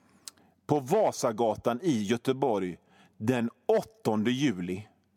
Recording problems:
none

